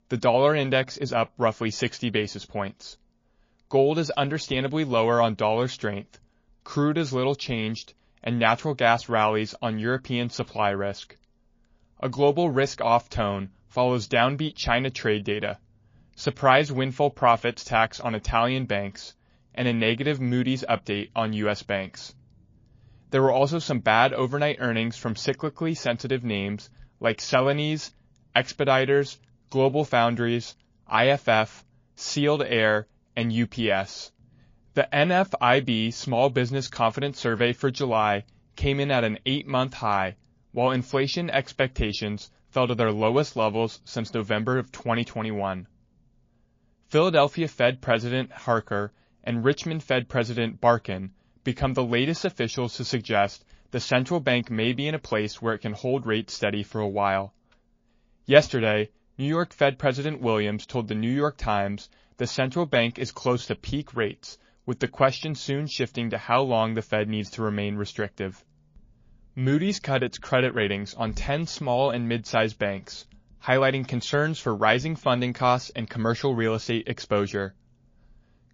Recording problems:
garbled, watery; slightly

